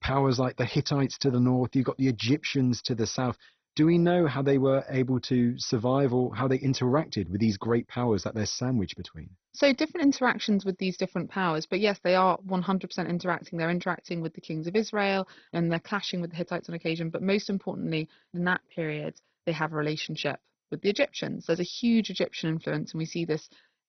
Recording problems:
garbled, watery; badly; nothing above 6 kHz

